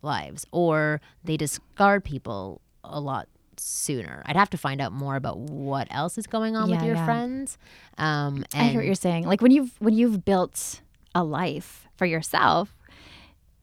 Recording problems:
none

